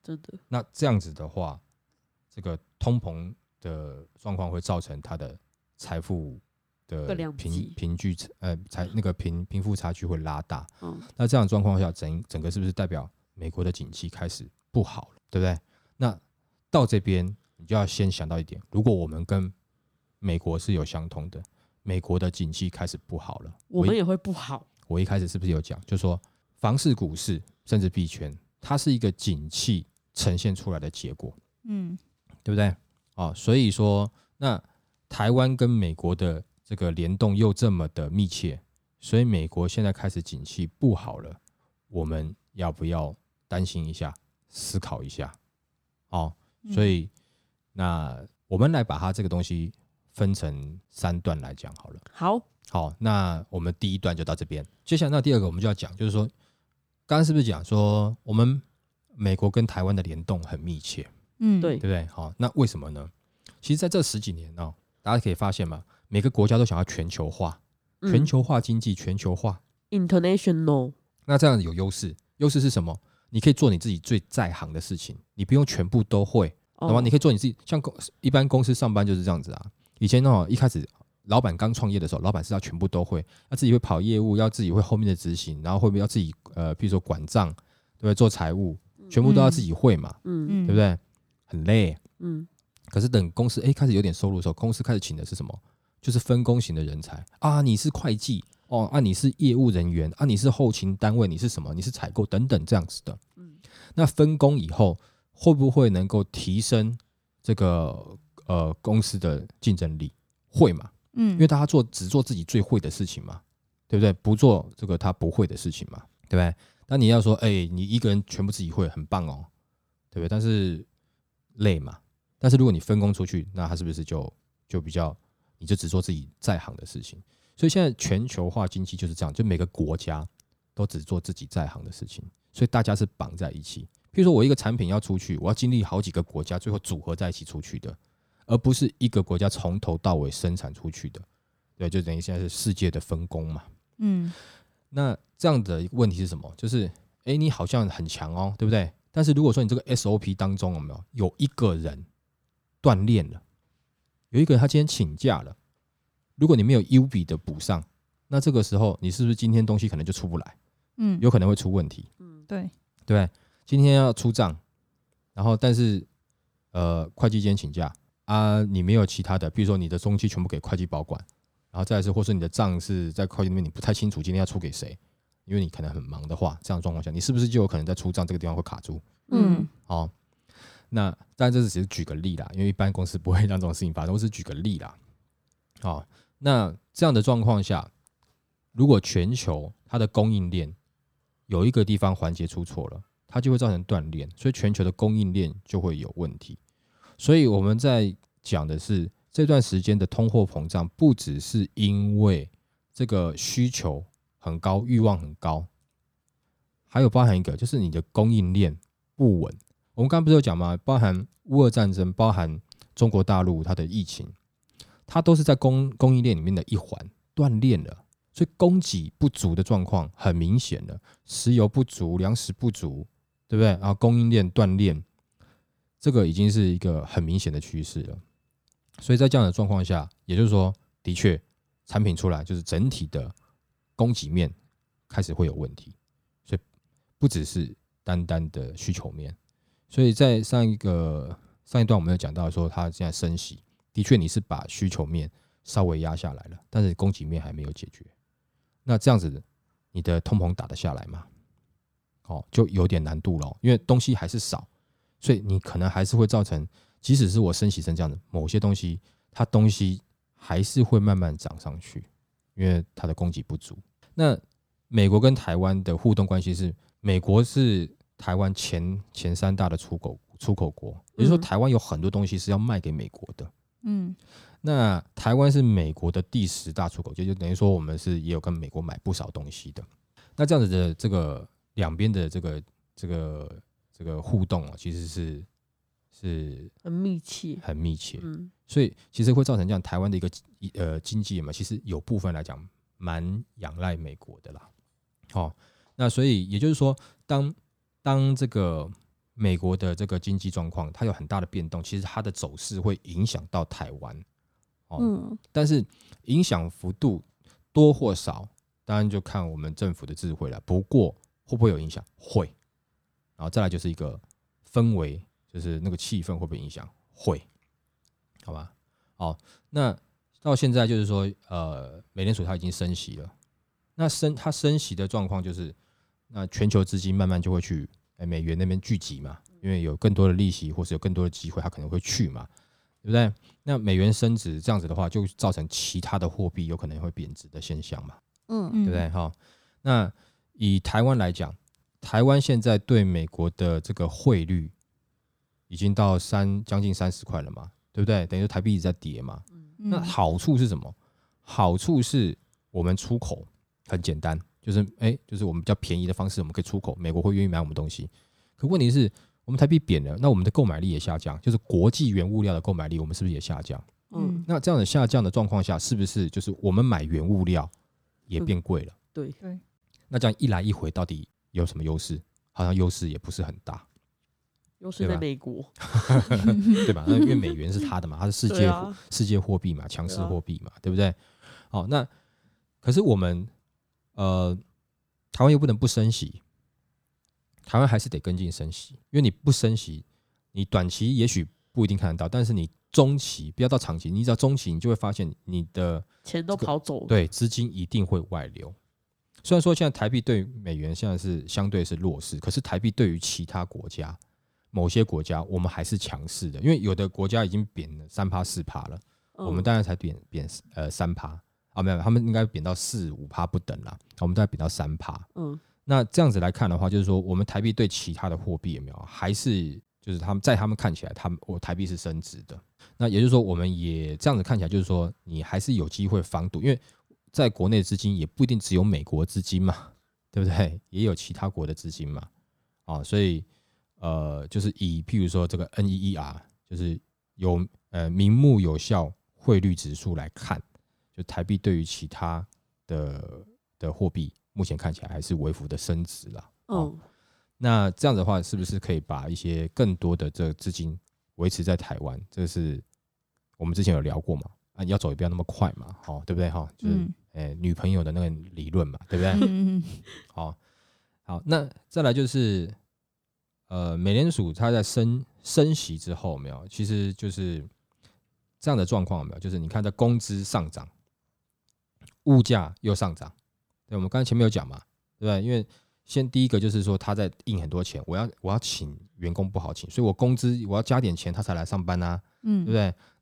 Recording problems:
none

